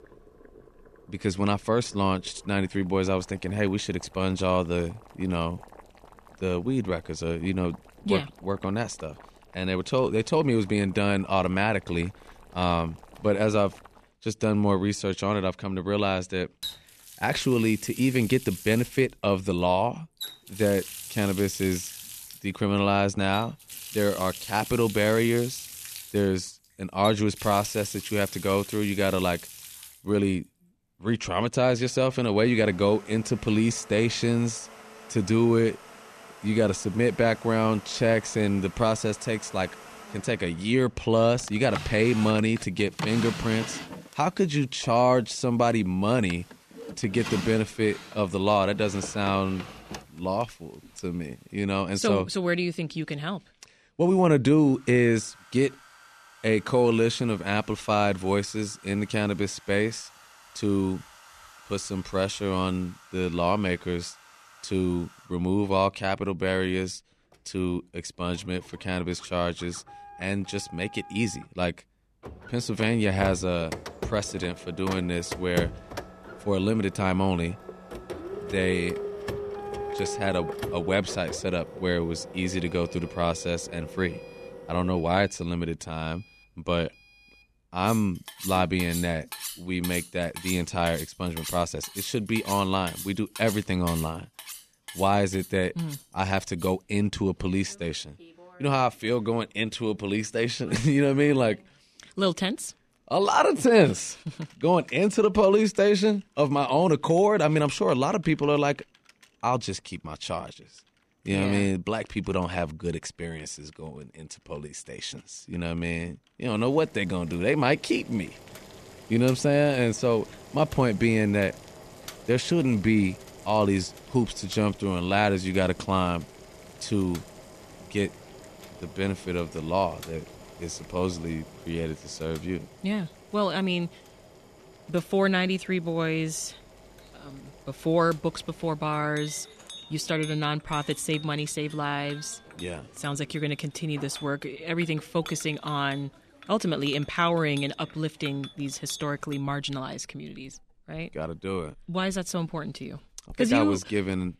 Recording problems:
household noises; noticeable; throughout; 15 dB below the speech

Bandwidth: 14 kHz